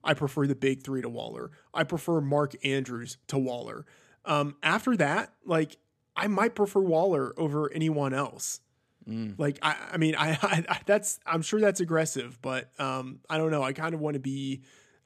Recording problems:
none

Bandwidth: 14.5 kHz